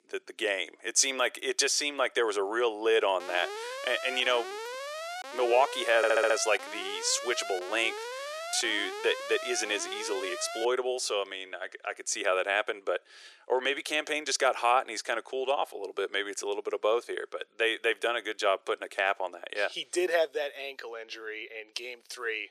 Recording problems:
thin; very; fading below 400 Hz
alarm; noticeable; from 3 to 11 s; peak 8 dB below the speech
audio stuttering; at 6 s

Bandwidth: 14.5 kHz